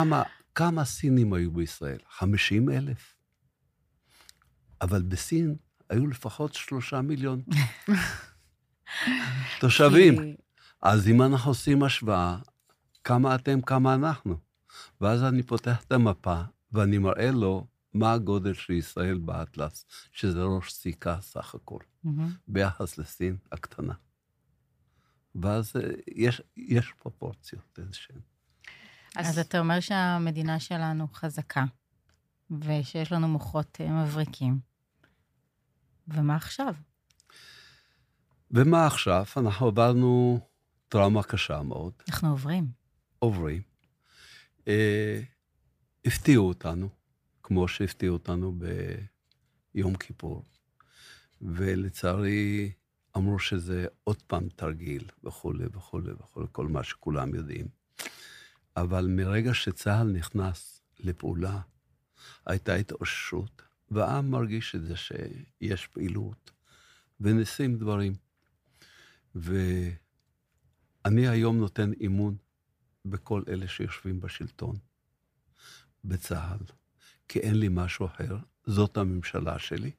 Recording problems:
abrupt cut into speech; at the start

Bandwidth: 15 kHz